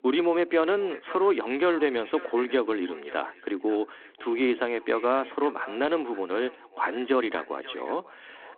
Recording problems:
echo of what is said; faint; throughout; 540 ms later, 20 dB below the speech
phone-call audio

